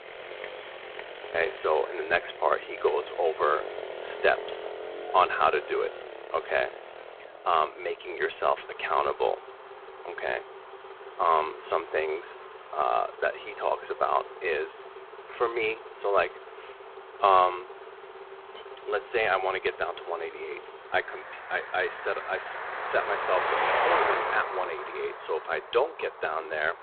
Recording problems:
phone-call audio; poor line; nothing above 4 kHz
traffic noise; loud; throughout; 8 dB below the speech

